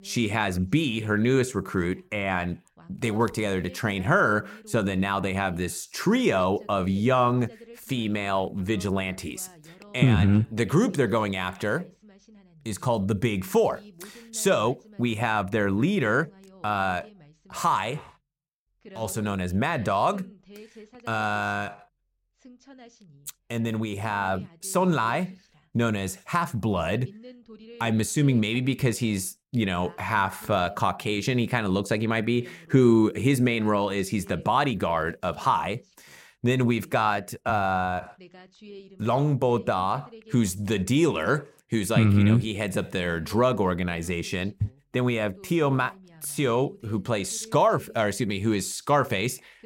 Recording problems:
voice in the background; faint; throughout; 25 dB below the speech

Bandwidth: 16.5 kHz